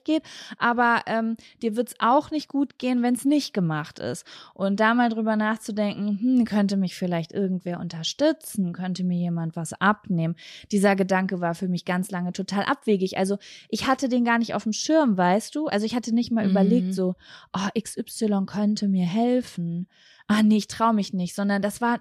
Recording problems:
none

